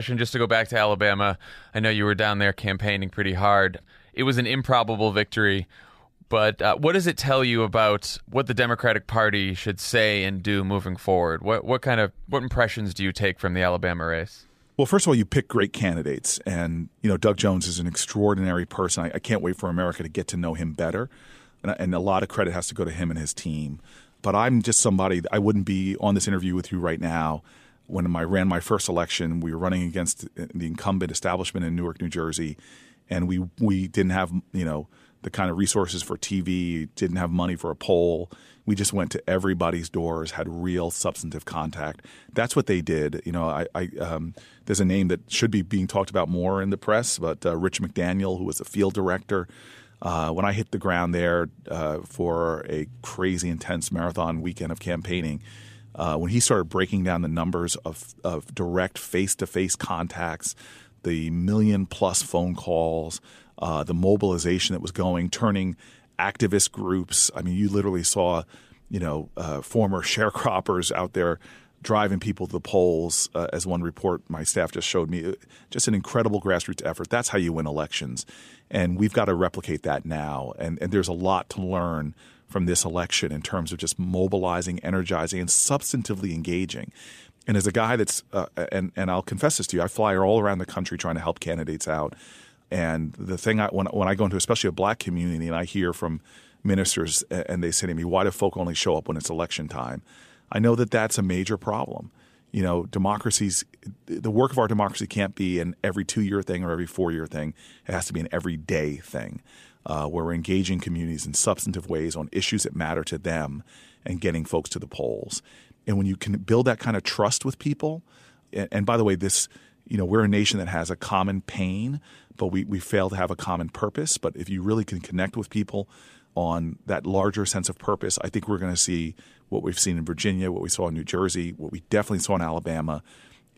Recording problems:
abrupt cut into speech; at the start

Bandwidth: 14.5 kHz